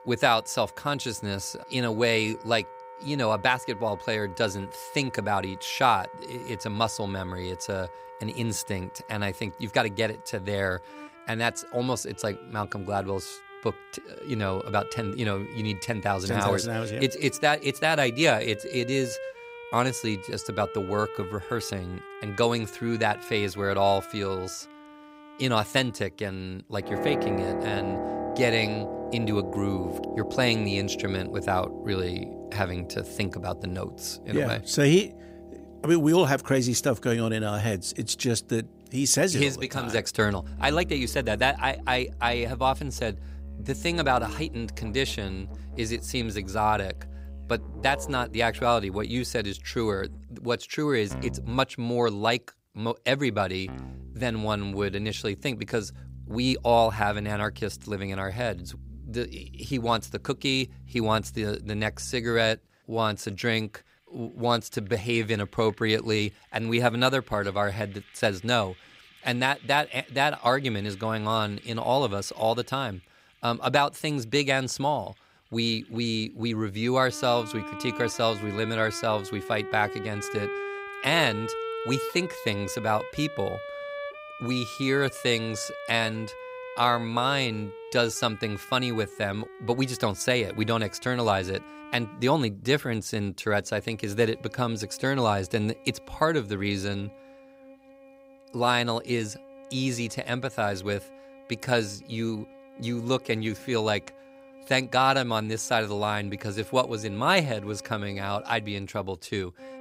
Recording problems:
background music; noticeable; throughout; 15 dB below the speech

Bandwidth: 15.5 kHz